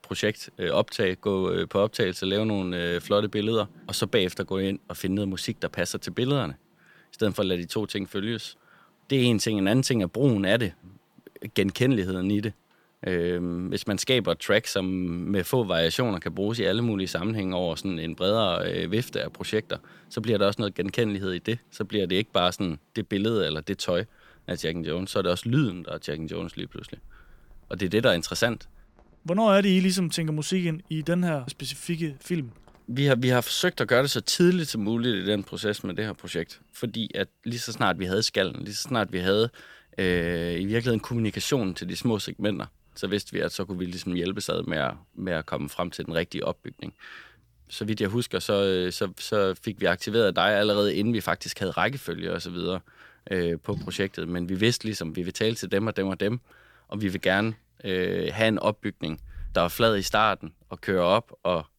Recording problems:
rain or running water; faint; throughout; 30 dB below the speech

